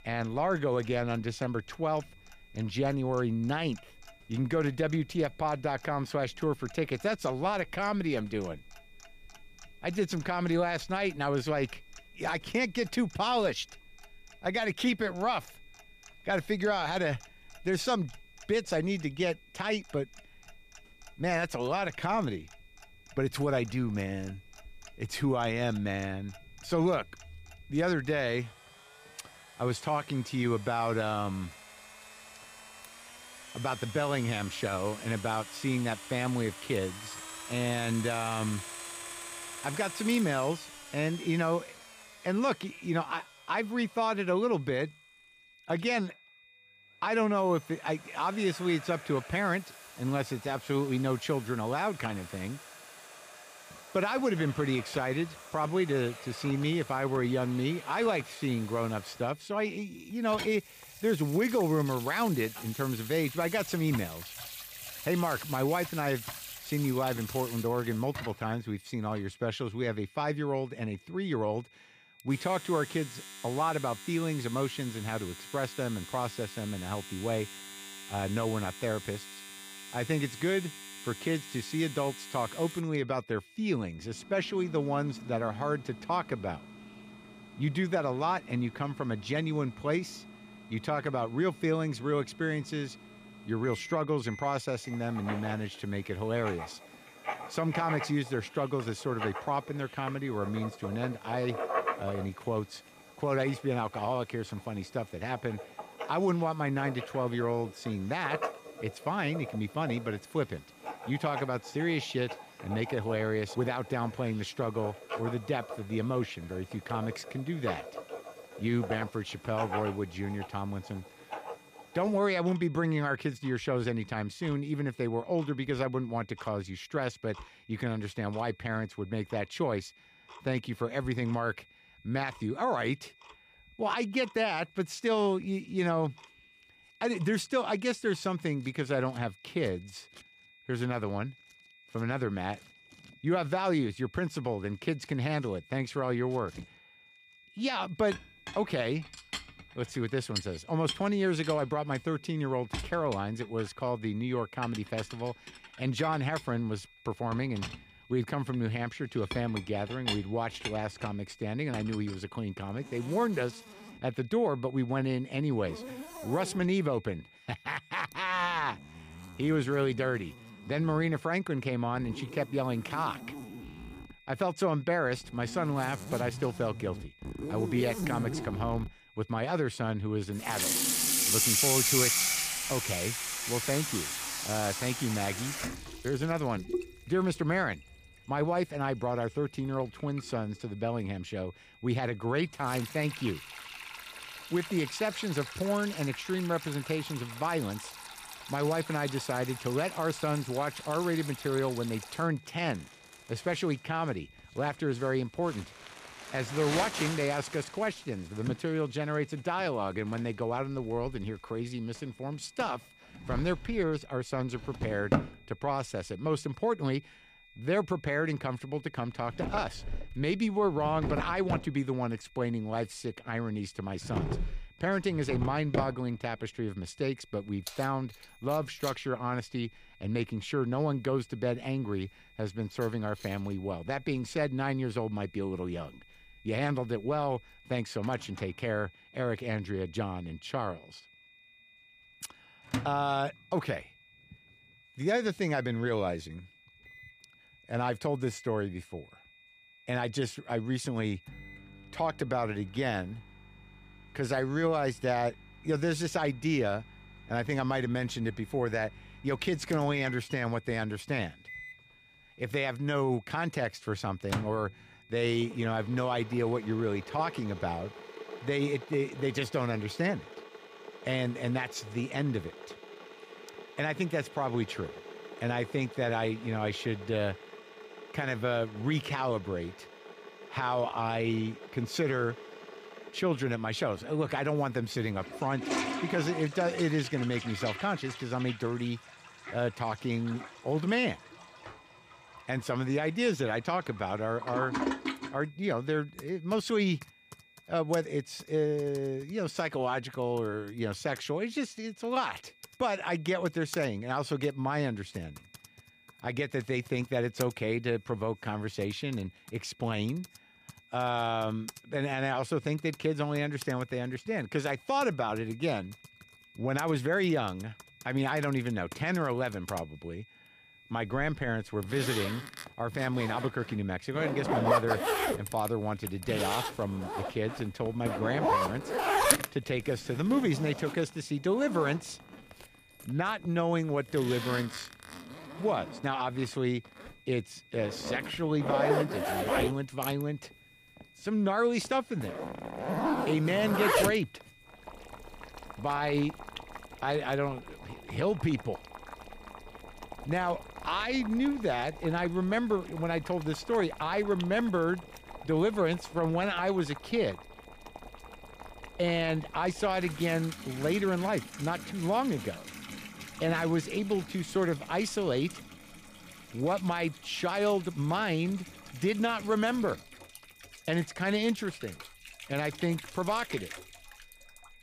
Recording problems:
household noises; loud; throughout; 7 dB below the speech
high-pitched whine; faint; throughout; 2.5 kHz, 25 dB below the speech

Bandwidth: 15 kHz